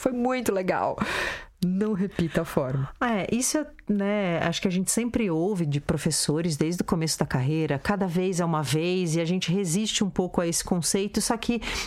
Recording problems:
squashed, flat; heavily

